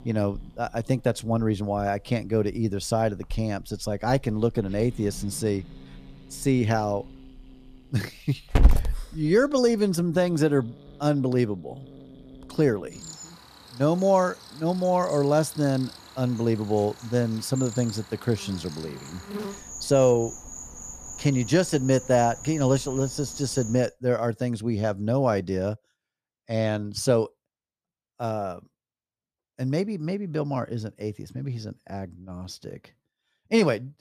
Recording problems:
animal sounds; loud; until 24 s; 10 dB below the speech

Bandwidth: 14.5 kHz